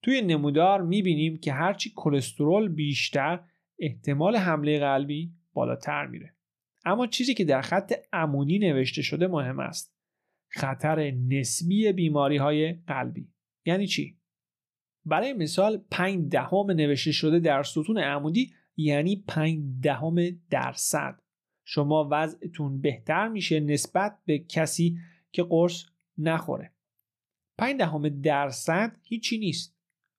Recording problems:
none

